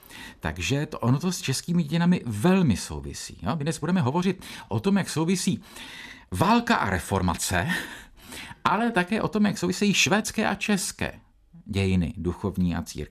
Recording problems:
uneven, jittery; strongly; from 1 to 12 s

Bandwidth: 14 kHz